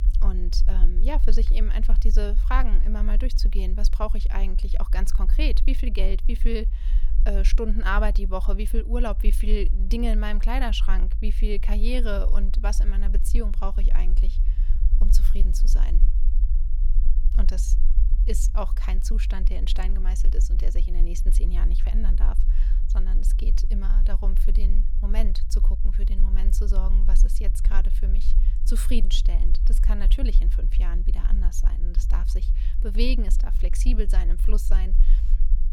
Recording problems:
low rumble; noticeable; throughout; 15 dB below the speech

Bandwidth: 18 kHz